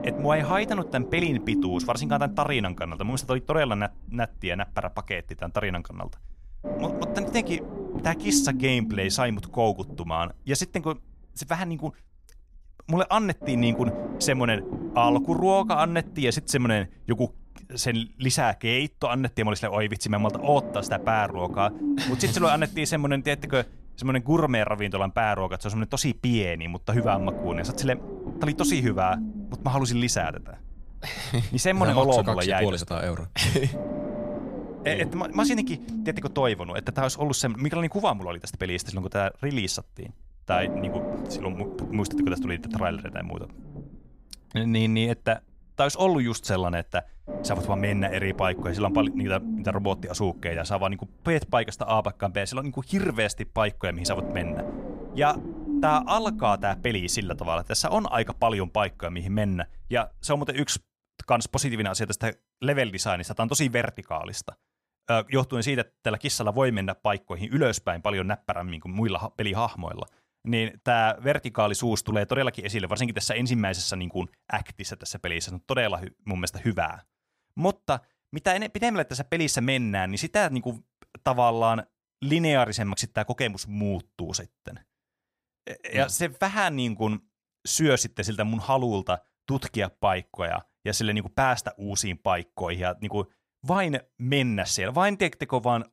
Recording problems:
low rumble; loud; until 1:00; 9 dB below the speech

